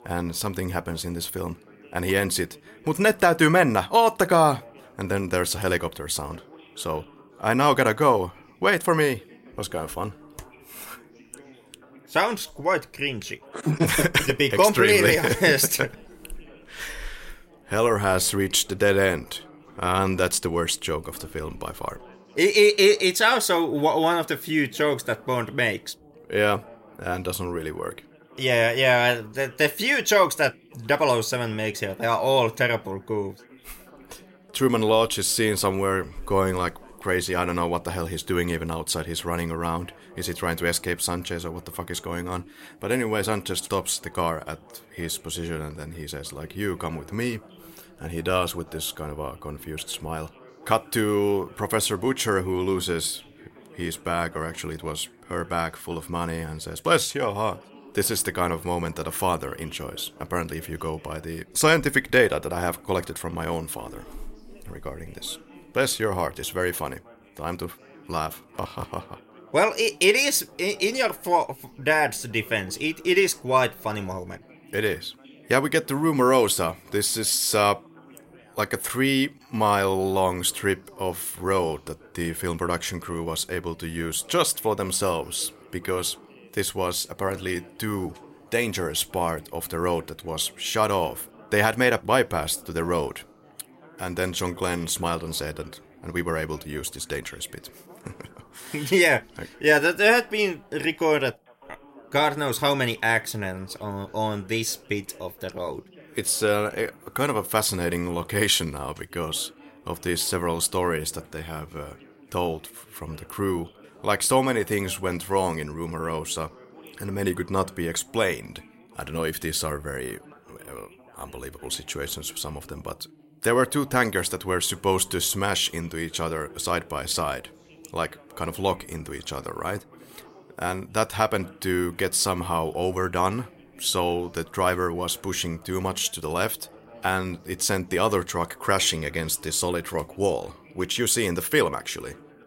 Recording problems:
background chatter; faint; throughout; 3 voices, 25 dB below the speech

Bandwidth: 16 kHz